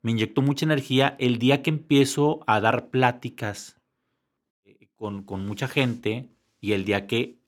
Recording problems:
none

